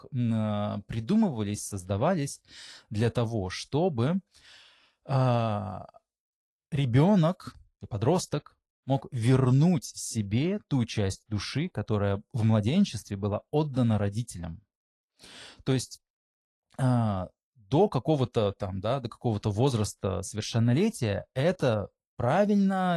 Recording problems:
garbled, watery; slightly; nothing above 11.5 kHz
abrupt cut into speech; at the end

